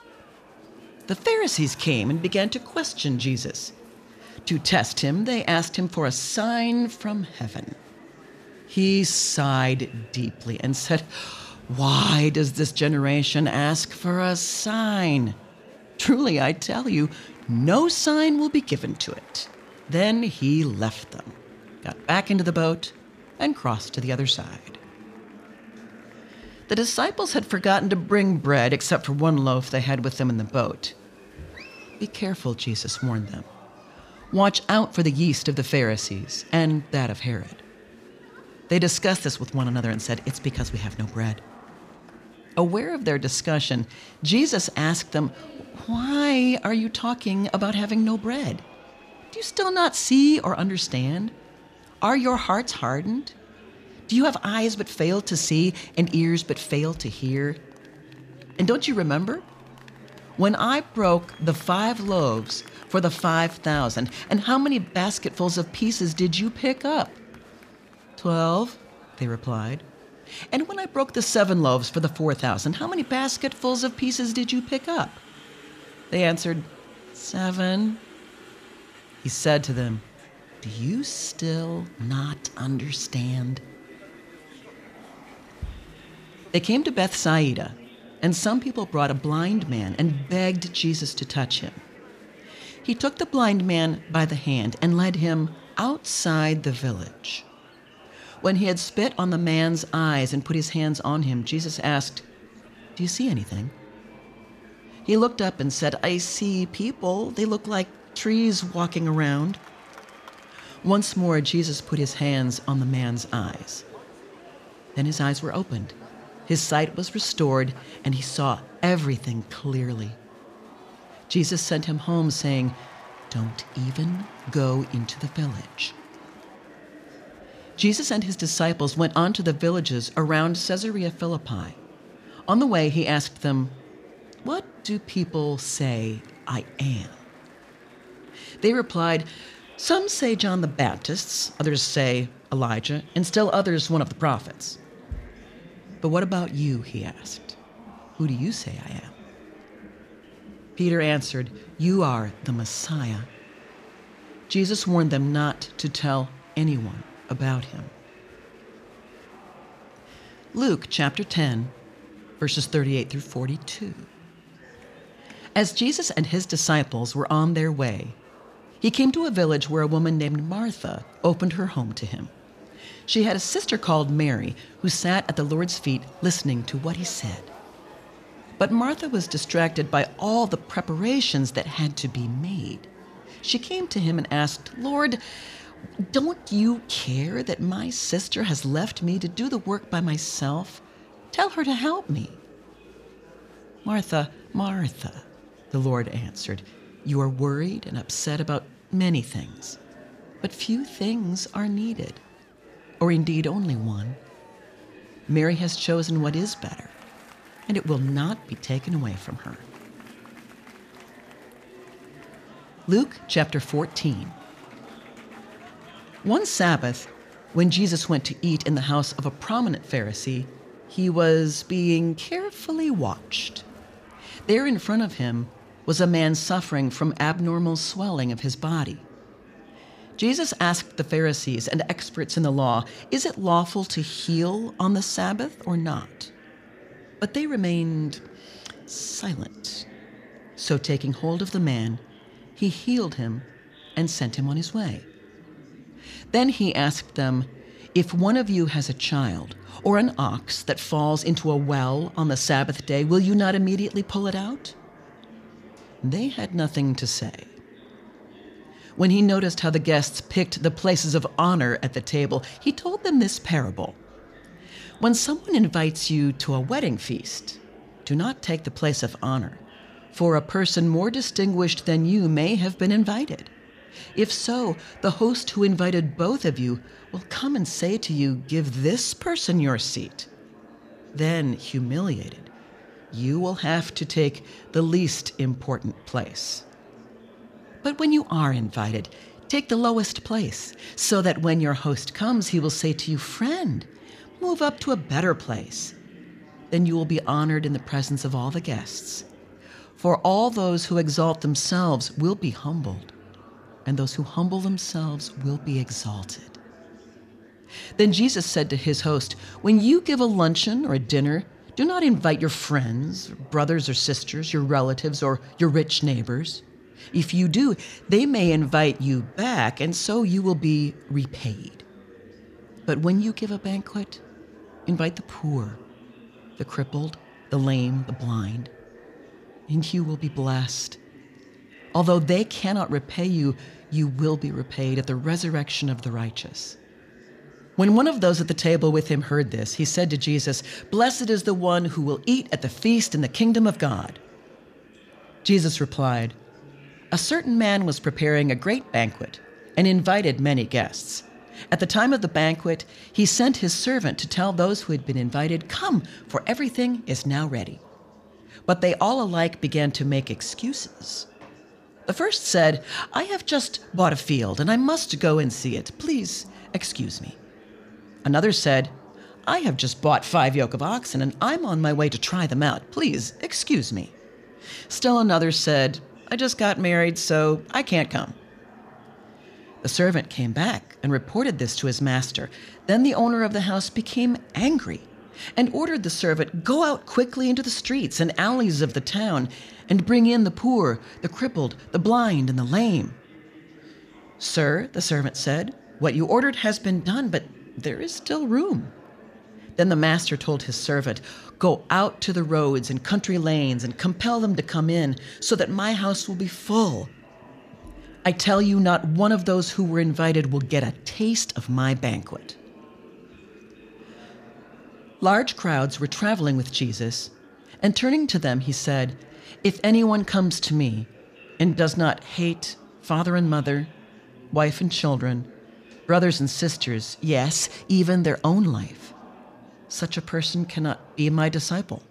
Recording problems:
murmuring crowd; faint; throughout; 25 dB below the speech

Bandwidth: 14.5 kHz